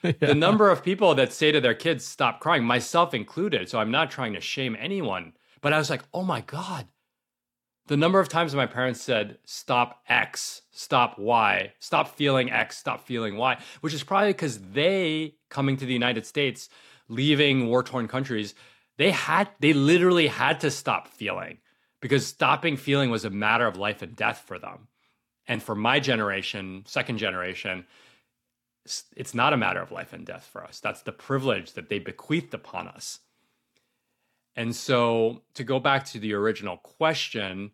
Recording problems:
none

